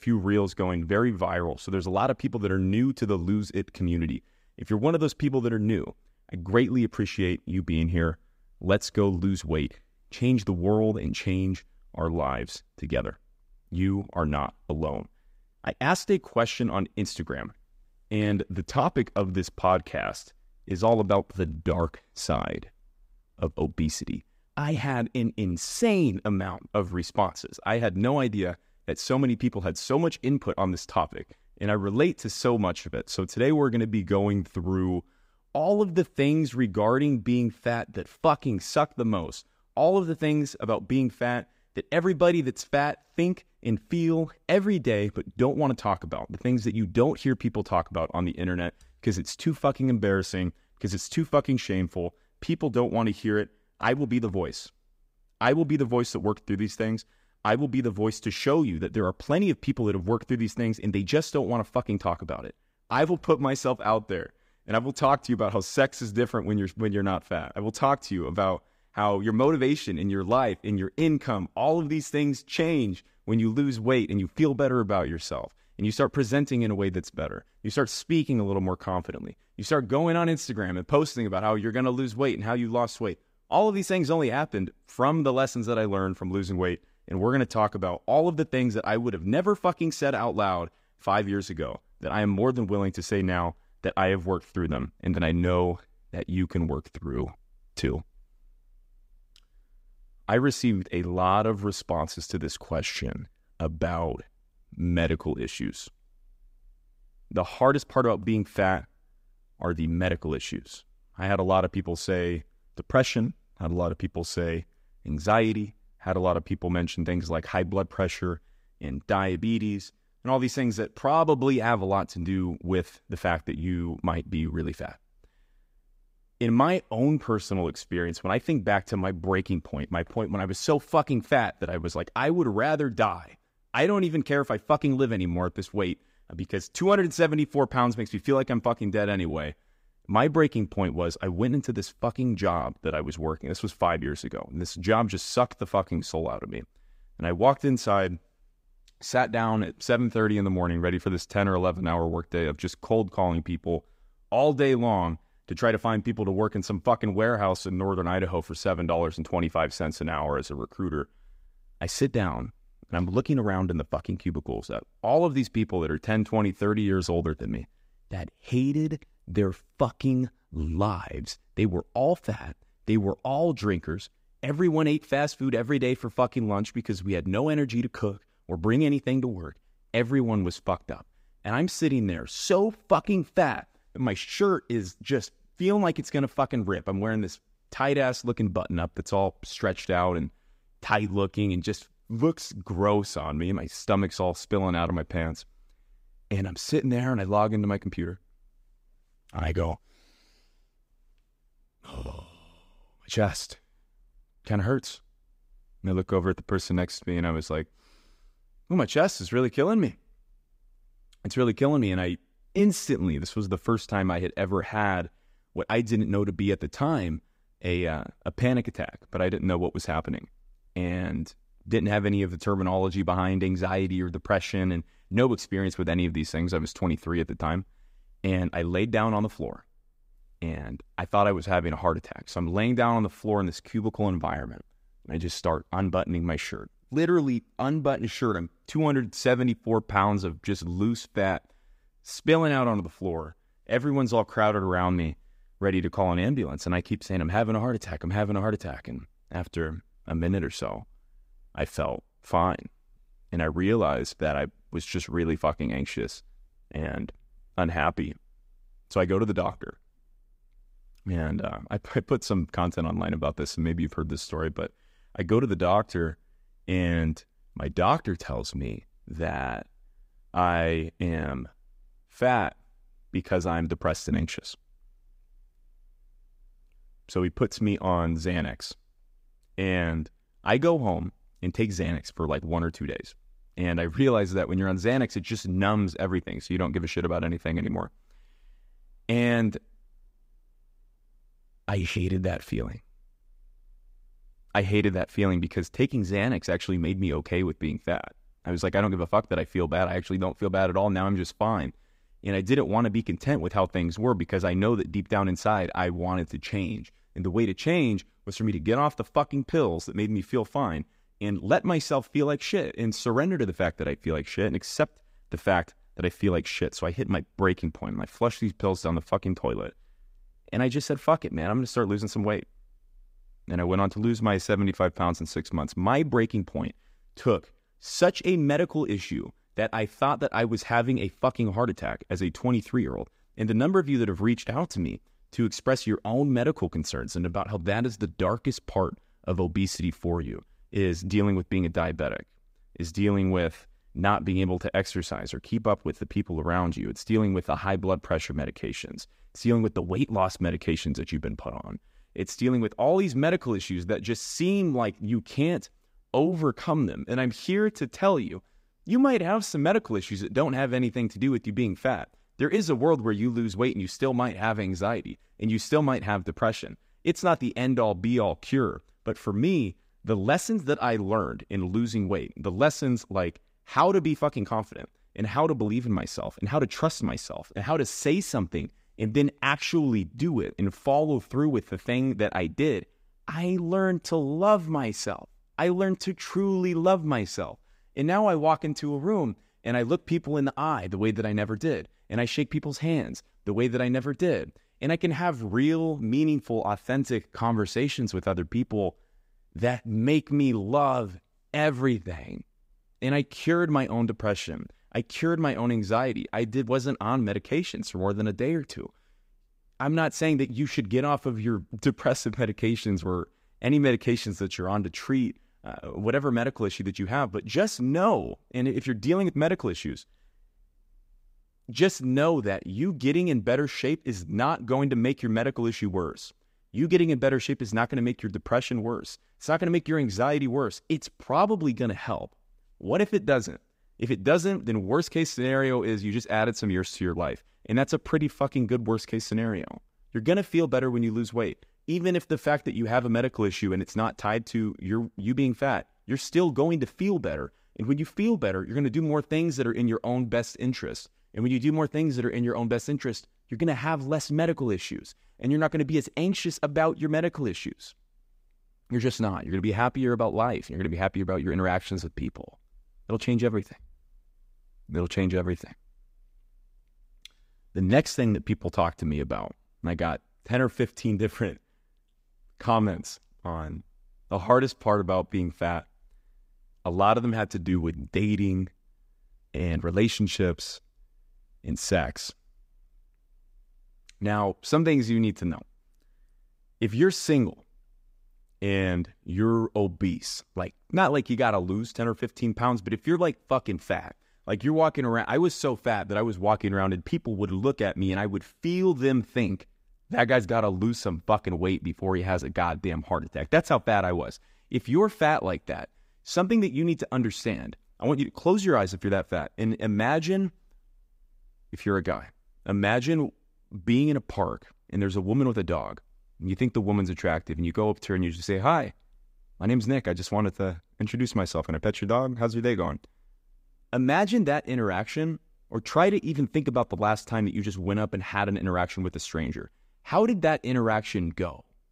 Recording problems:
none

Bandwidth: 15.5 kHz